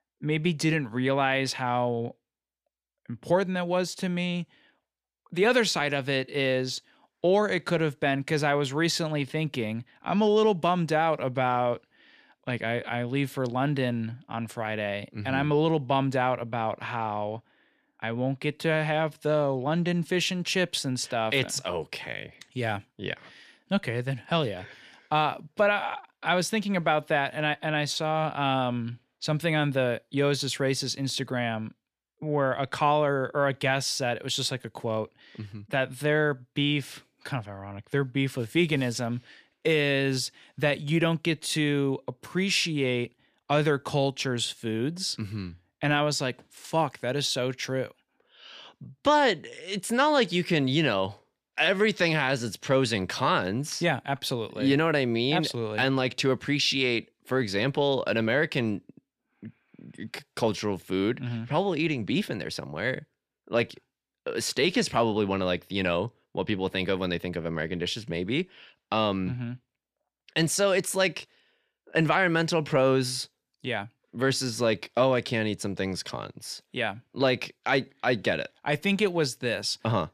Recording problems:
none

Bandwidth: 14.5 kHz